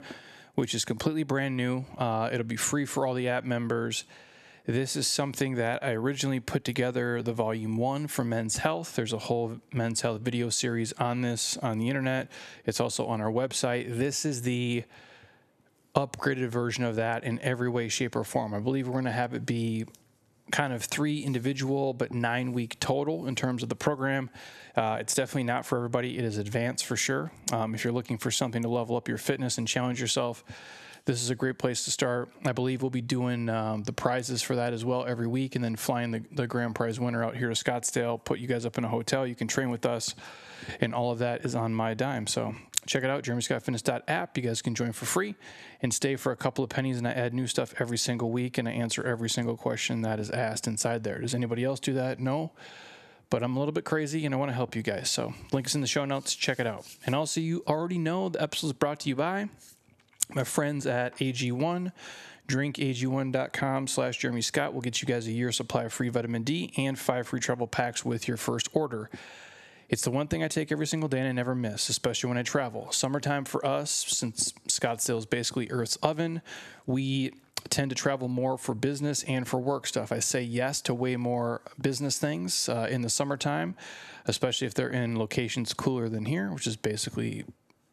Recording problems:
squashed, flat; somewhat

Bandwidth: 13.5 kHz